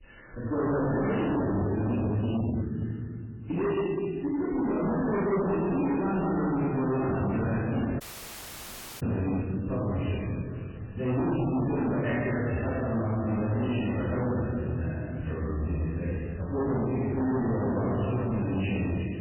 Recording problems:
distortion; heavy; 27% of the sound clipped
room echo; strong; dies away in 2.5 s
off-mic speech; far
garbled, watery; badly; nothing above 3 kHz
audio cutting out; at 8 s for 1 s

